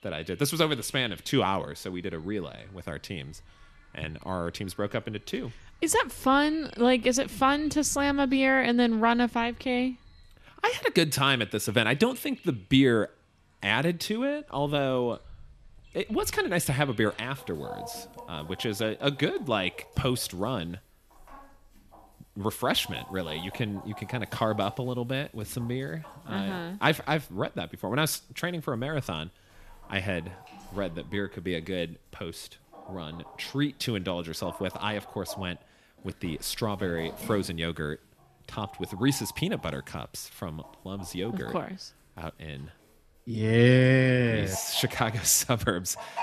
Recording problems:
animal sounds; faint; throughout; 20 dB below the speech

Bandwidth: 14 kHz